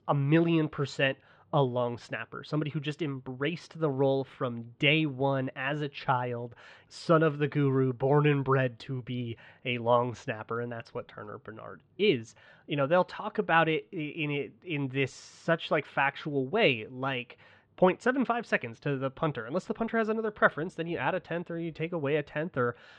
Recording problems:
muffled; very; fading above 3.5 kHz

